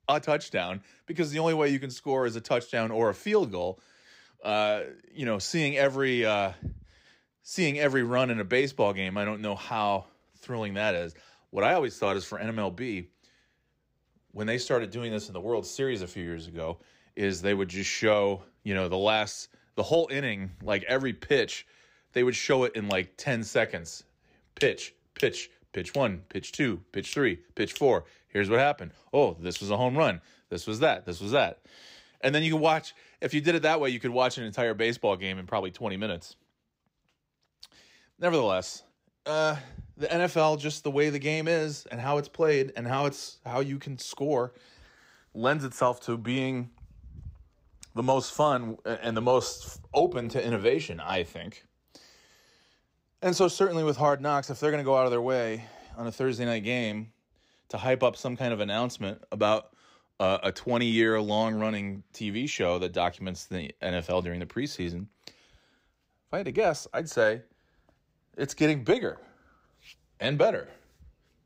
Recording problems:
none

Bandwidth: 15.5 kHz